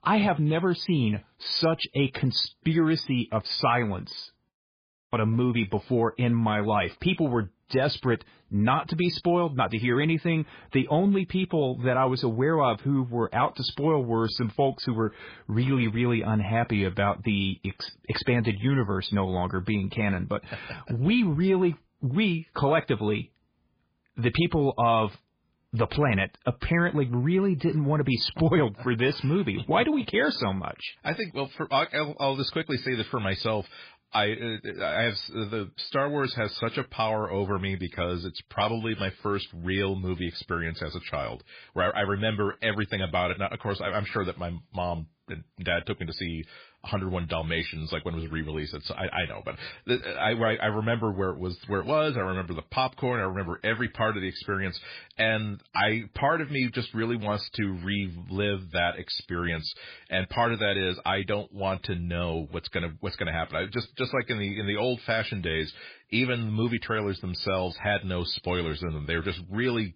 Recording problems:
garbled, watery; badly; nothing above 5 kHz
audio cutting out; at 4.5 s for 0.5 s

